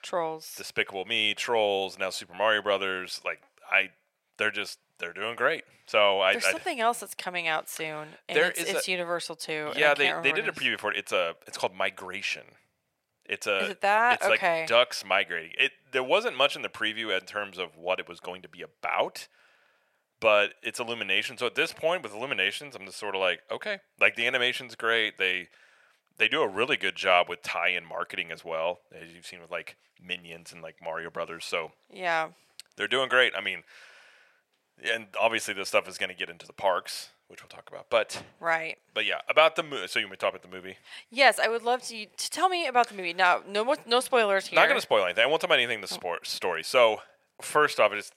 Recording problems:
thin; very; fading below 550 Hz

